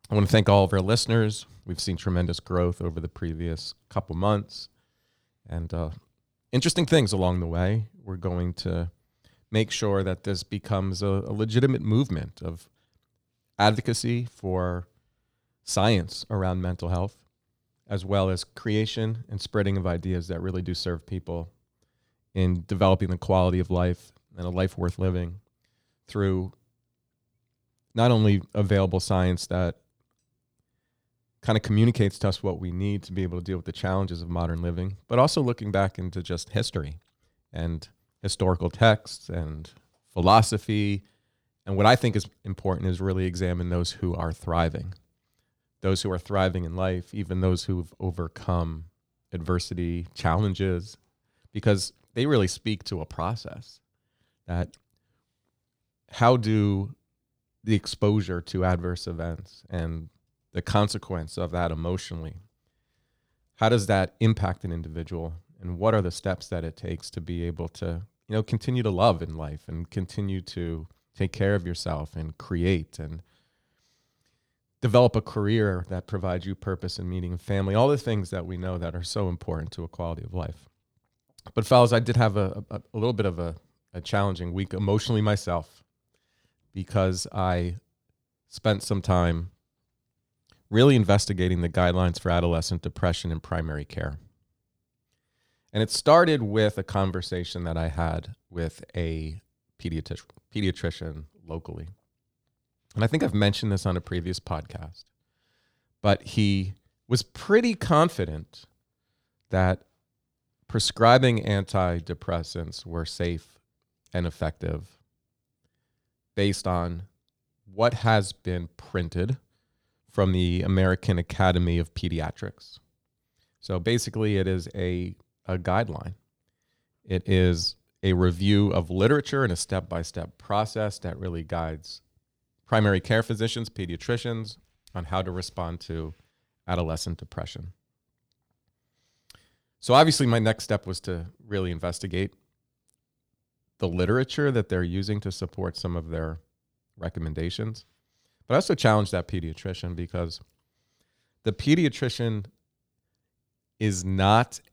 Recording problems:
none

